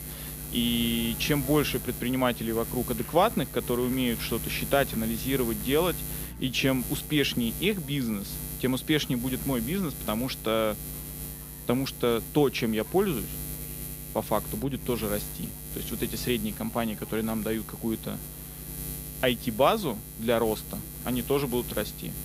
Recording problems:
electrical hum; noticeable; throughout; 60 Hz, 15 dB below the speech
chatter from many people; faint; throughout; 25 dB below the speech

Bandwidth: 15.5 kHz